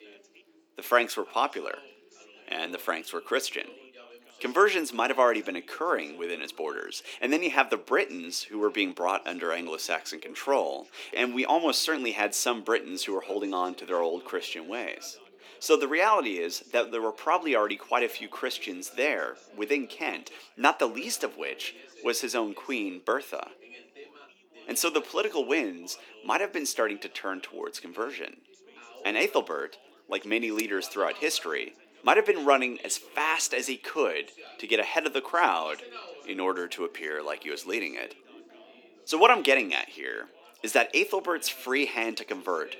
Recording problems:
thin; somewhat; fading below 300 Hz
background chatter; faint; throughout; 3 voices, 25 dB below the speech

